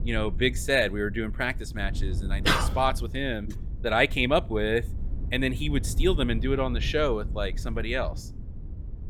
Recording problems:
low rumble; faint; throughout; 20 dB below the speech

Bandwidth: 17 kHz